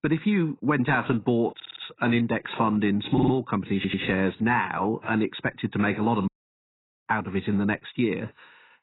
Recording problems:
garbled, watery; badly; nothing above 4 kHz
audio stuttering; at 1.5 s, at 3 s and at 4 s
audio cutting out; at 6.5 s for 1 s

